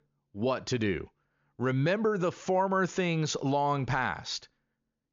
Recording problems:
high frequencies cut off; noticeable; nothing above 7 kHz

